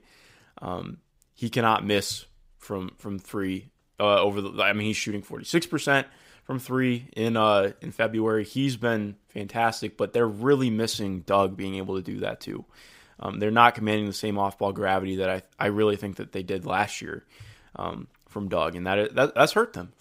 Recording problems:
none

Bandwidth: 15.5 kHz